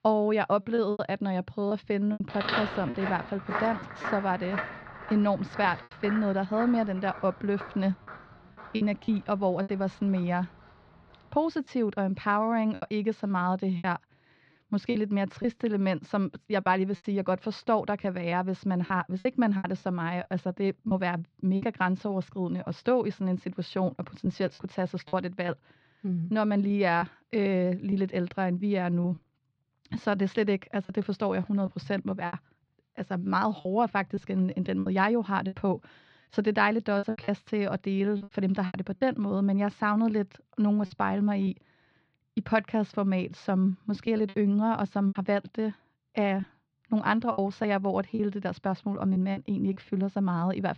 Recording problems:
muffled; slightly; fading above 4 kHz
choppy; very; 6% of the speech affected
footsteps; noticeable; from 2.5 to 10 s; peak 1 dB below the speech

